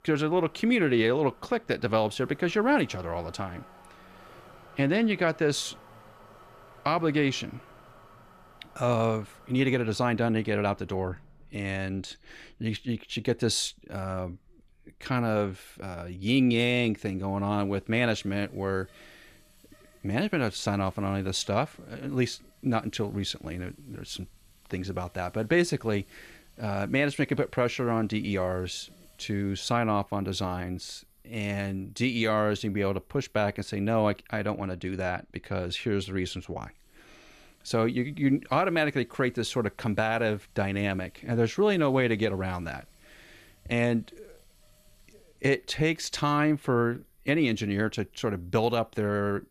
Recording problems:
traffic noise; faint; throughout; 30 dB below the speech

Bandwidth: 14.5 kHz